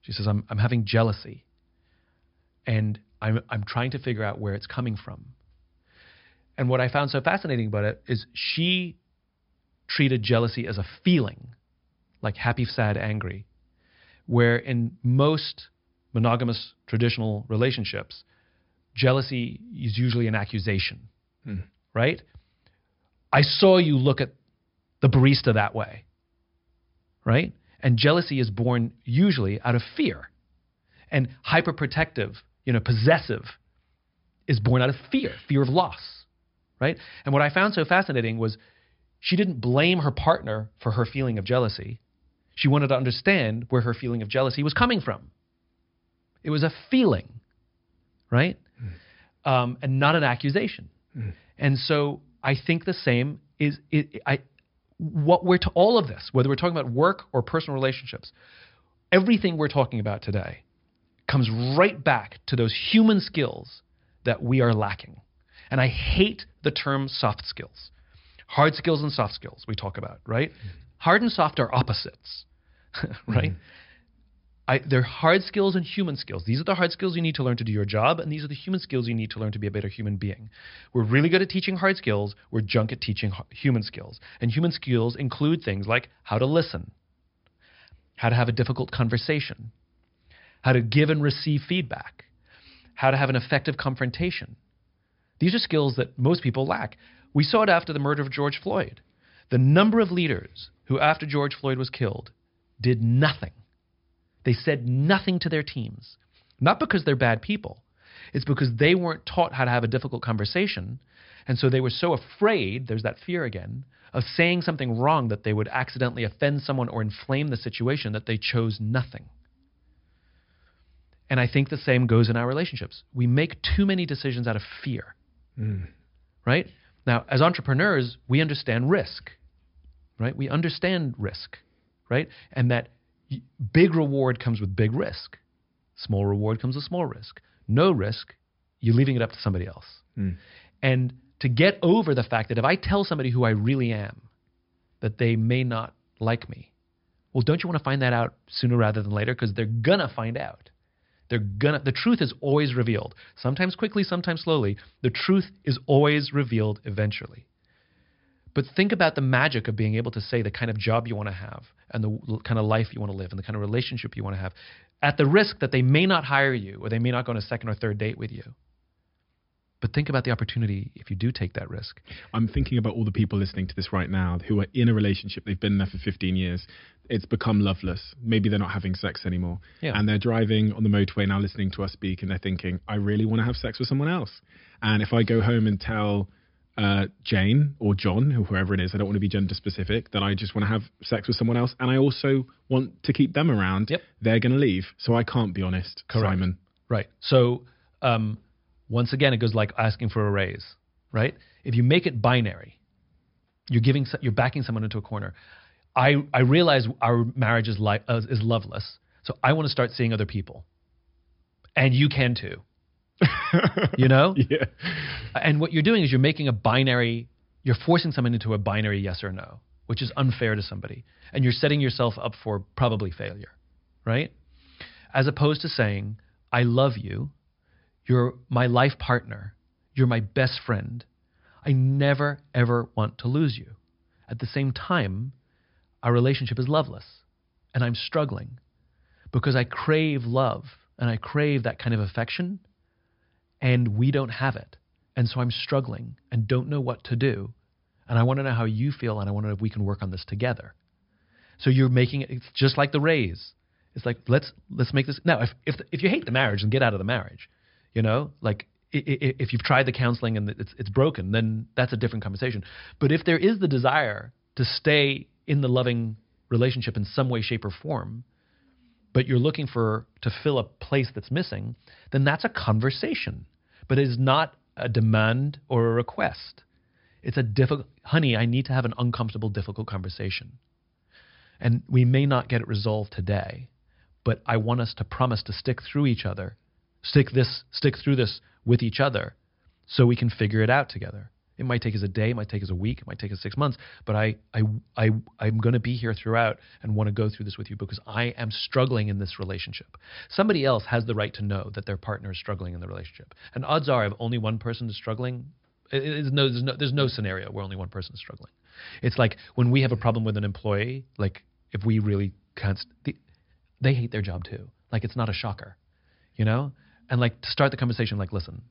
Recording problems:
high frequencies cut off; noticeable; nothing above 5.5 kHz

